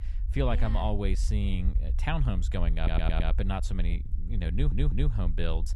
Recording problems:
low rumble; noticeable; throughout; 15 dB below the speech
audio stuttering; at 3 s and at 4.5 s

